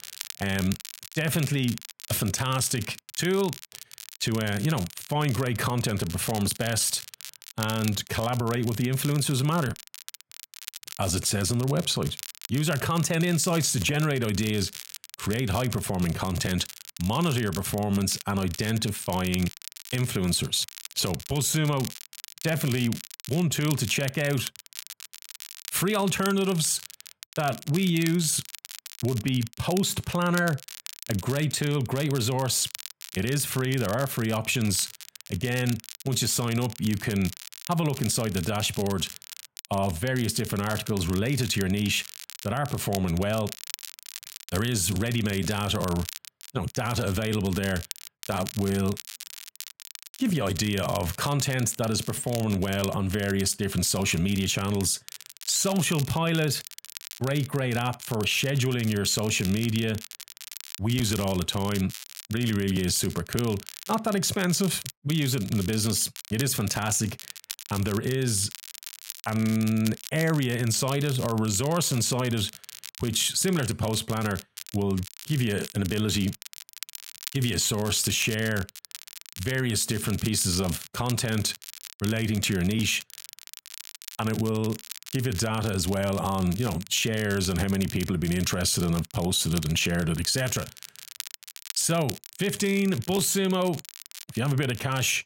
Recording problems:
crackle, like an old record; noticeable; 15 dB below the speech

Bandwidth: 16 kHz